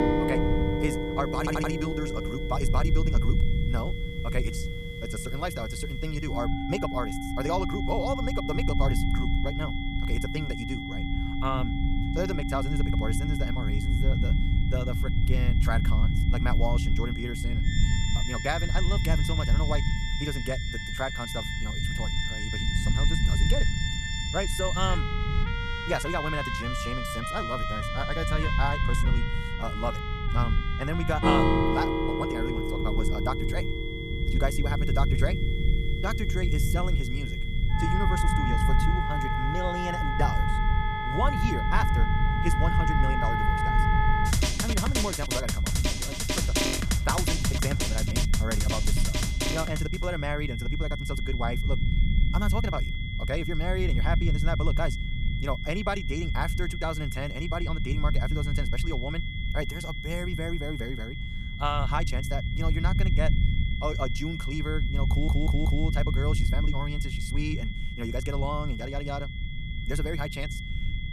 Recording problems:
wrong speed, natural pitch; too fast; 1.8 times normal speed
background music; very loud; until 50 s; 2 dB above the speech
high-pitched whine; loud; throughout; 2 kHz, 6 dB below the speech
low rumble; noticeable; throughout; 10 dB below the speech
audio stuttering; at 1.5 s and at 1:05

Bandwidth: 14.5 kHz